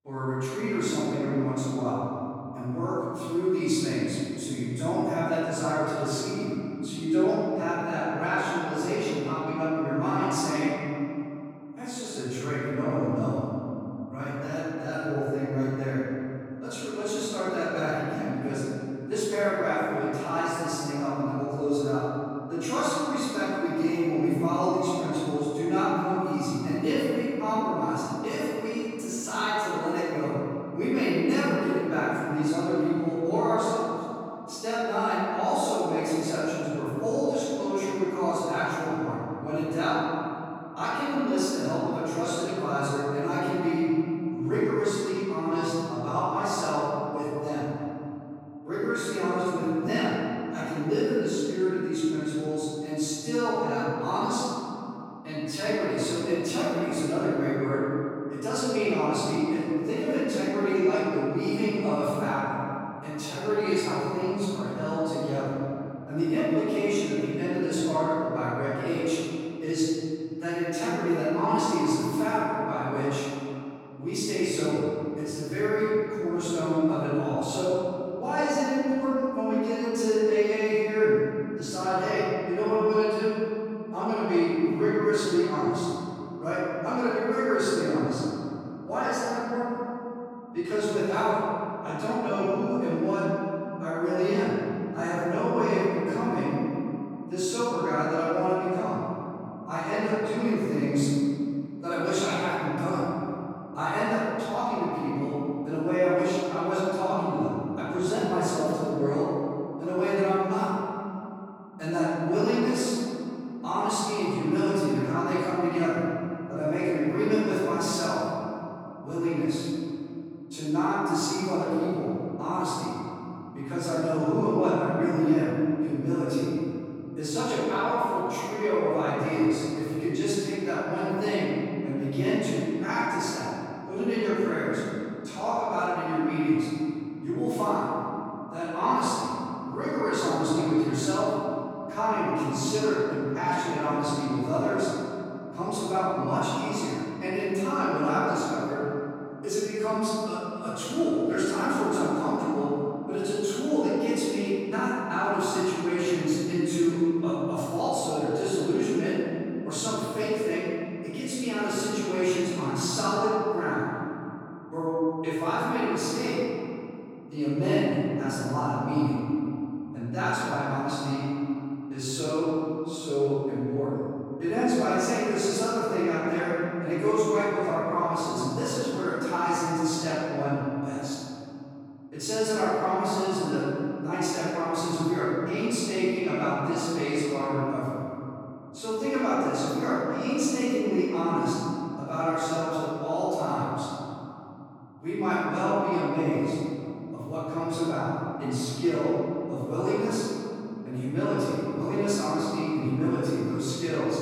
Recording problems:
room echo; strong; dies away in 3 s
off-mic speech; far

